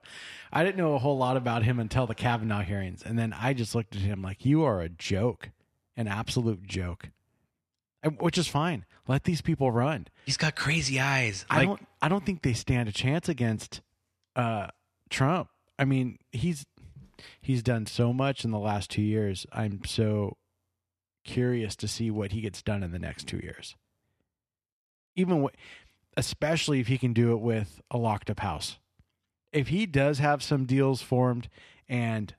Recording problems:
none

